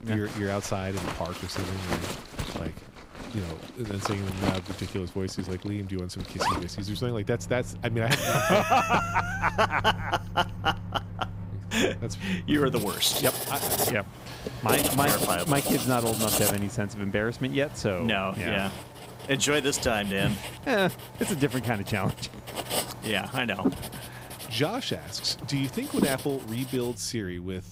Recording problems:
household noises; loud; throughout; 5 dB below the speech

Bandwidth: 15.5 kHz